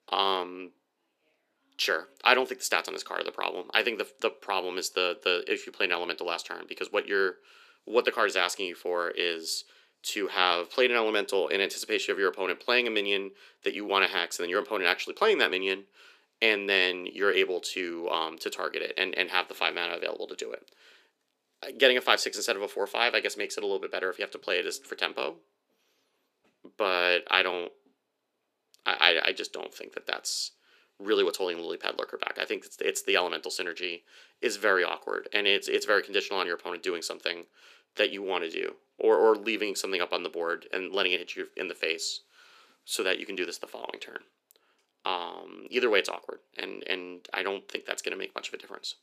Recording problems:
thin; somewhat; fading below 300 Hz

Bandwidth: 14.5 kHz